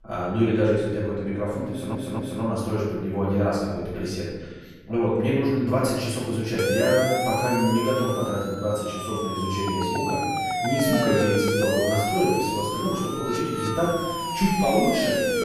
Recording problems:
room echo; strong; dies away in 1.4 s
off-mic speech; far
audio stuttering; at 1.5 s
siren; loud; from 6.5 s on; peak 2 dB above the speech

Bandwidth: 13.5 kHz